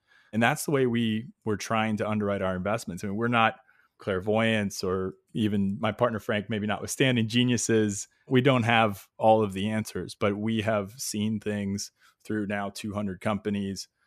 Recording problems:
none

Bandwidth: 14.5 kHz